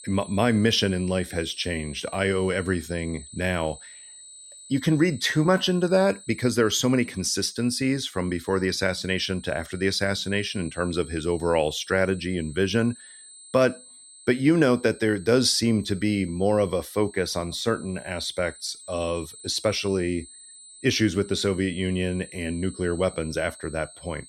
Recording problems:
high-pitched whine; noticeable; throughout; 8 kHz, 20 dB below the speech

